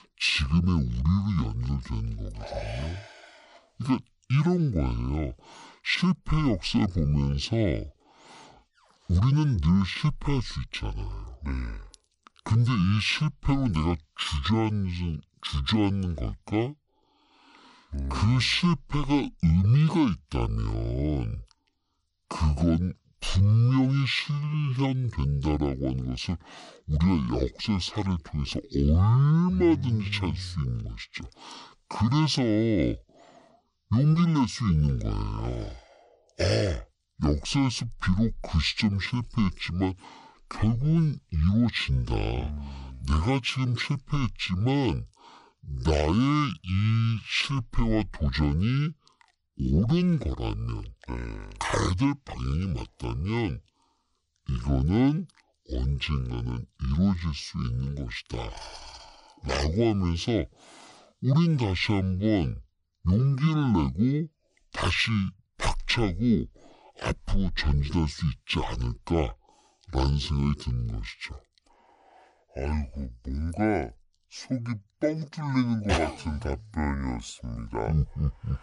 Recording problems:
wrong speed and pitch; too slow and too low; 0.6 times normal speed

